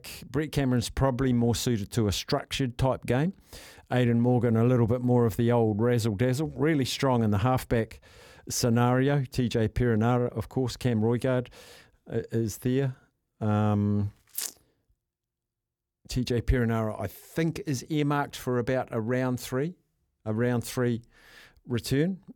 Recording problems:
none

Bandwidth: 18.5 kHz